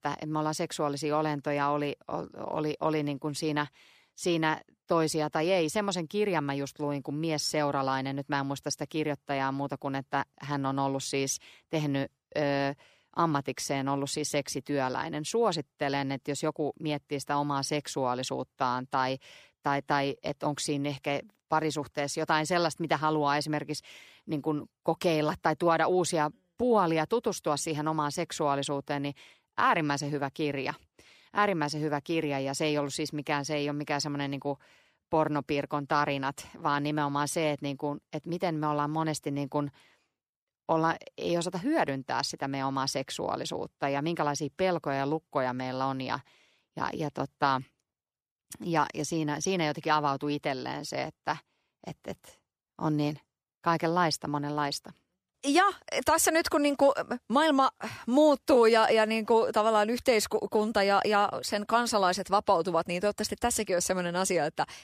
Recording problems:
none

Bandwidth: 15 kHz